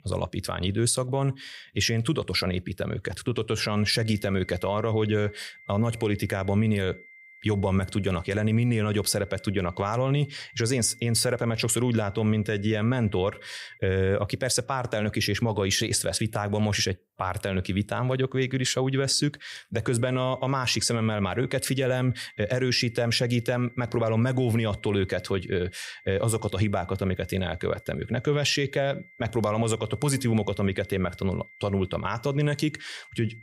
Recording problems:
high-pitched whine; faint; from 4 to 14 s and from 20 s on; 2 kHz, 25 dB below the speech

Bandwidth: 15.5 kHz